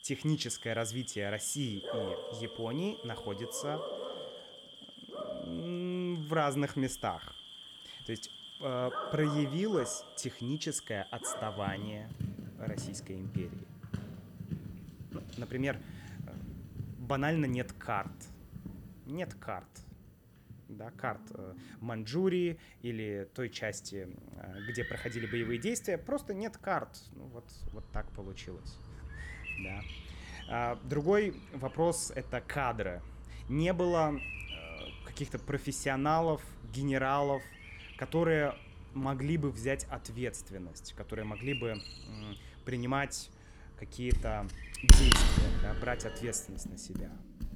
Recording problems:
animal sounds; loud; throughout; 3 dB below the speech

